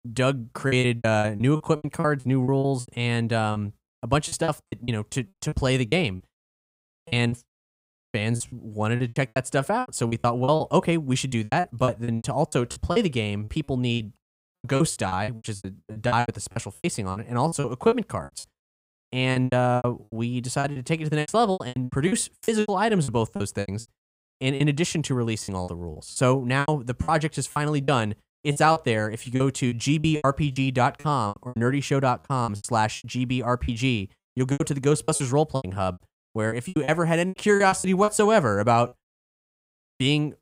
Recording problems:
choppy; very; 17% of the speech affected

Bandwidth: 15.5 kHz